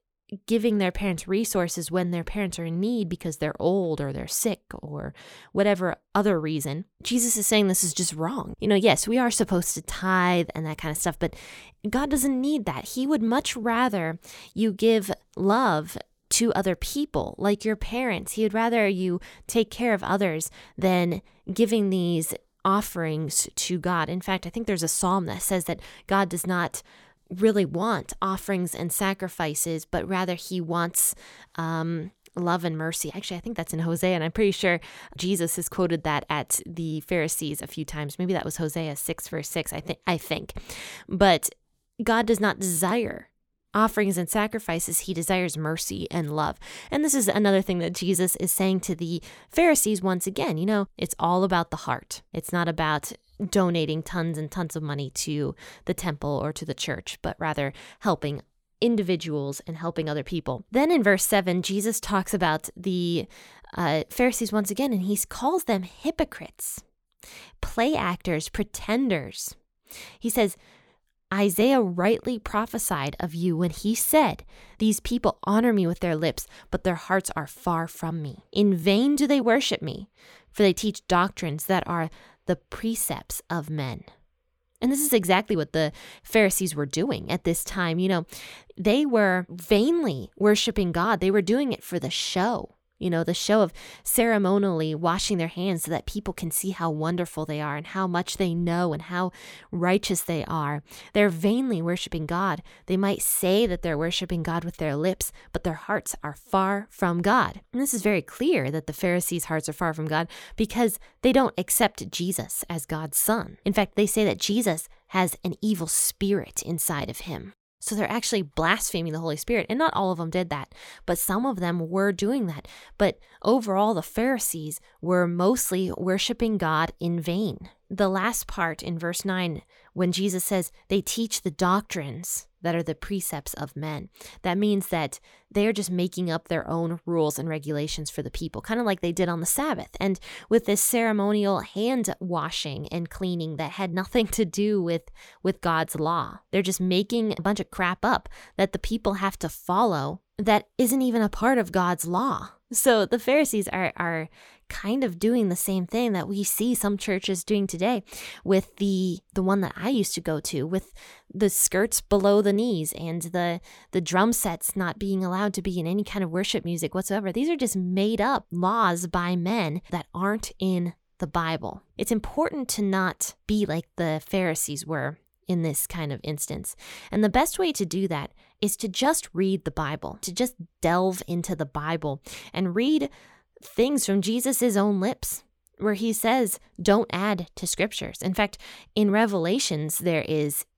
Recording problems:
none

